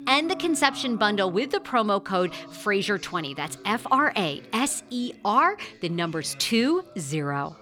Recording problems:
background music; faint; throughout; 20 dB below the speech
voice in the background; faint; throughout; 20 dB below the speech

